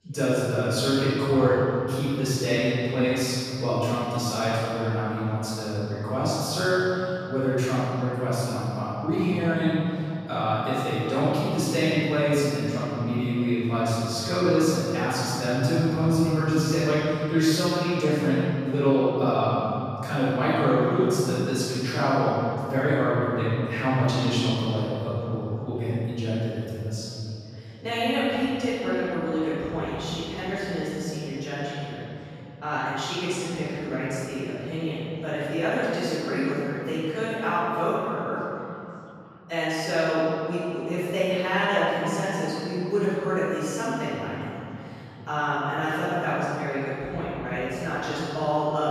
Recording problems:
room echo; strong; dies away in 3 s
off-mic speech; far
background chatter; faint; throughout; 3 voices, 25 dB below the speech

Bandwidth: 14.5 kHz